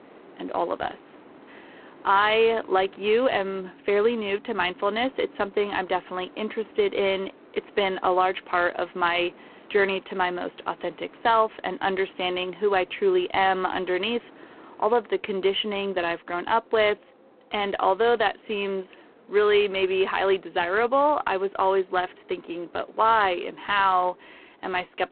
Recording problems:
phone-call audio; poor line
wind in the background; faint; throughout; 25 dB below the speech

